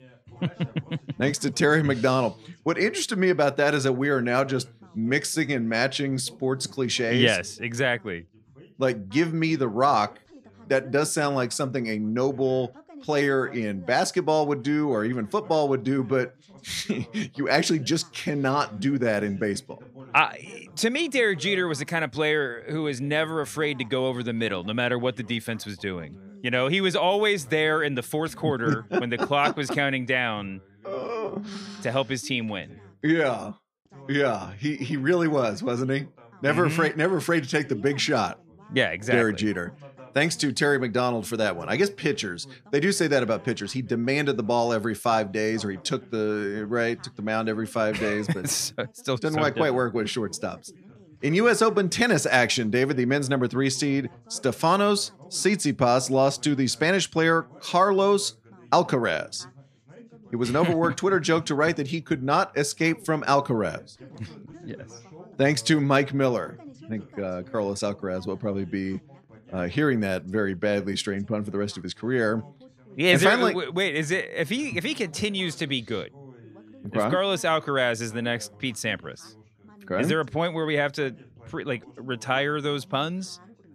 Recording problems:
background chatter; faint; throughout; 2 voices, 25 dB below the speech

